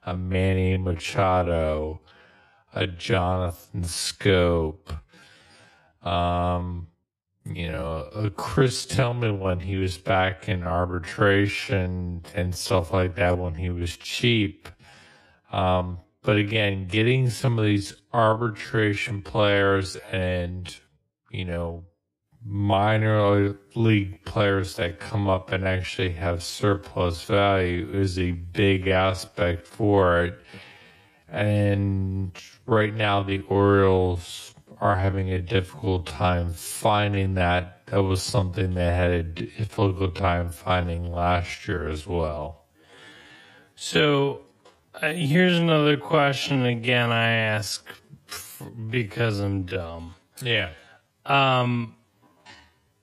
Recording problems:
wrong speed, natural pitch; too slow; 0.5 times normal speed

